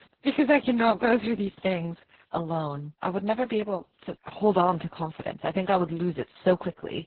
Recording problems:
garbled, watery; badly; nothing above 4 kHz

